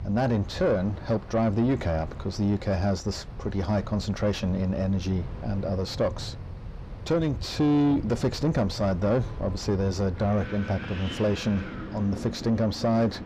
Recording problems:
echo of what is said; faint; from 5 s on; 380 ms later, 25 dB below the speech
distortion; slight; 9 dB below the speech
wind in the background; noticeable; throughout; 10 dB below the speech

